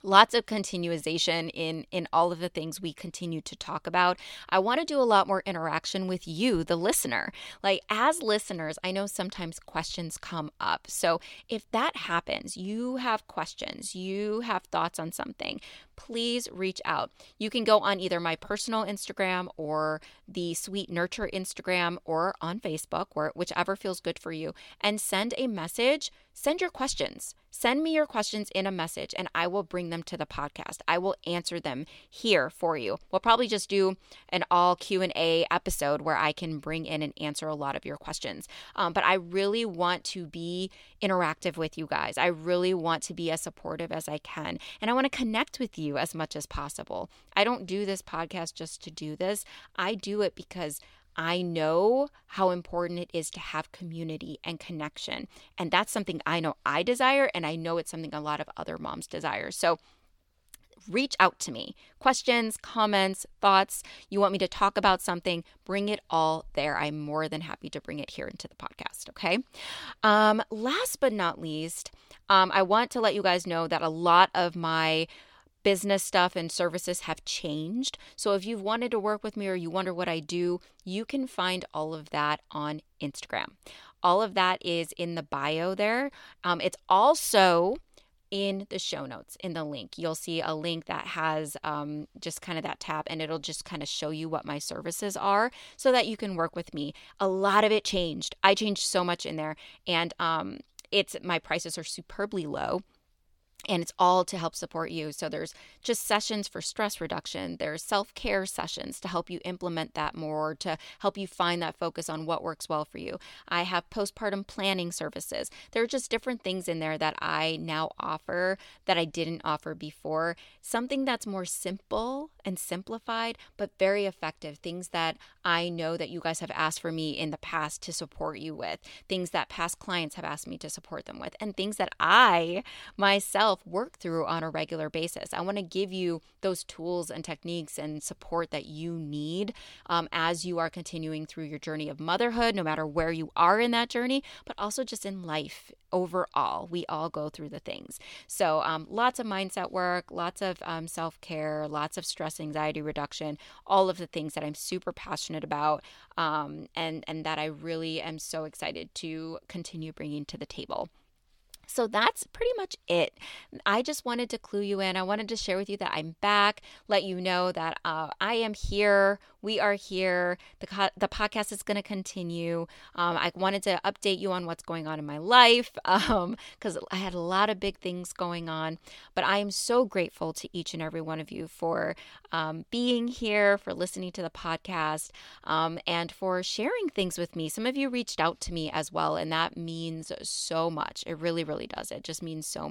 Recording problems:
abrupt cut into speech; at the end

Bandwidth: 17.5 kHz